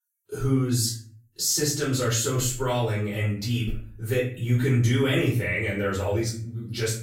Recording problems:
off-mic speech; far
room echo; noticeable; dies away in 0.4 s

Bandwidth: 16 kHz